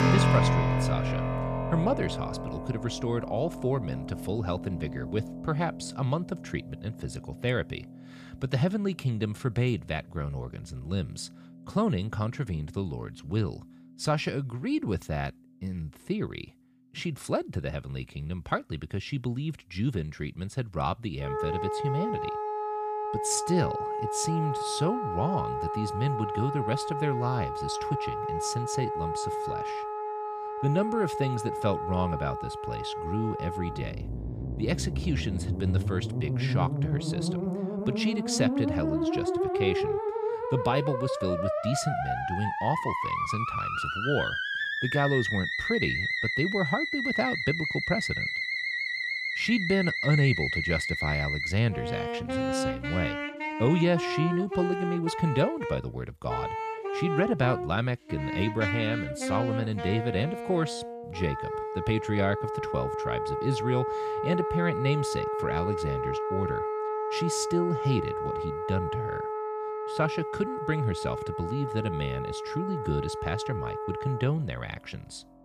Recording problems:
background music; loud; throughout; as loud as the speech

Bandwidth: 15 kHz